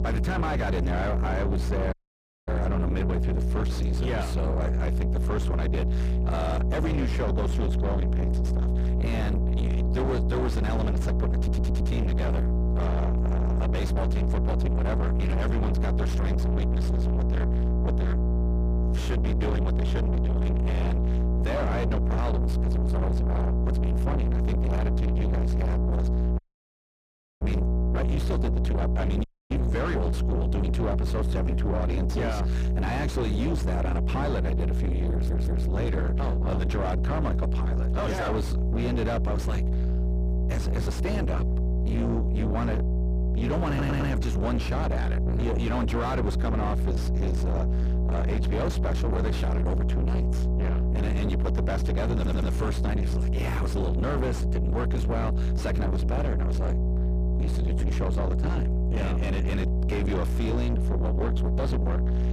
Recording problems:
distortion; heavy; 6 dB below the speech
electrical hum; loud; throughout; 60 Hz, 3 dB below the speech
audio cutting out; at 2 s for 0.5 s, at 26 s for 1 s and at 29 s
audio stuttering; 4 times, first at 11 s

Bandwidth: 15 kHz